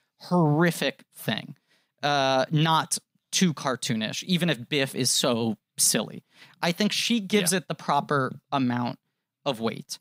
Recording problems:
none

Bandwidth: 15.5 kHz